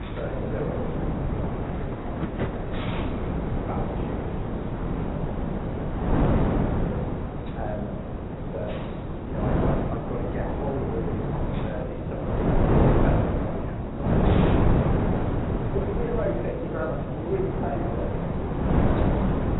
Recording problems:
garbled, watery; badly; nothing above 3.5 kHz
room echo; slight; dies away in 0.8 s
off-mic speech; somewhat distant
wind noise on the microphone; heavy; 4 dB above the speech
rain or running water; loud; throughout; 8 dB below the speech
hiss; noticeable; throughout; 15 dB below the speech

